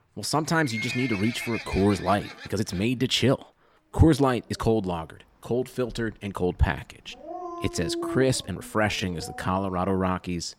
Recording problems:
animal sounds; loud; throughout; 10 dB below the speech
uneven, jittery; strongly; from 1.5 to 9.5 s

